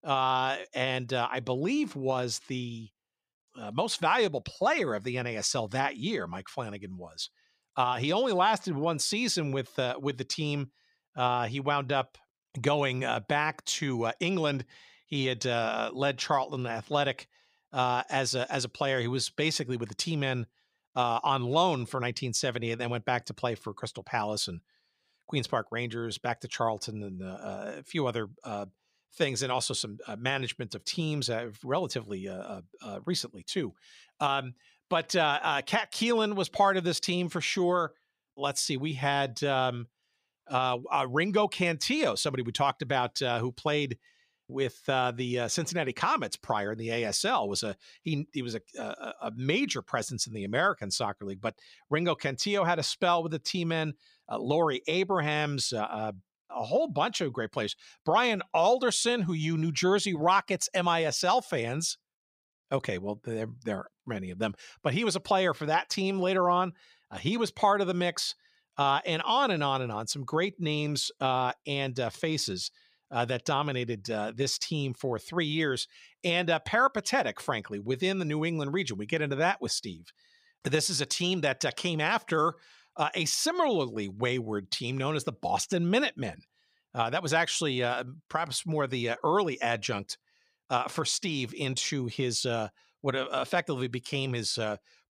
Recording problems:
none

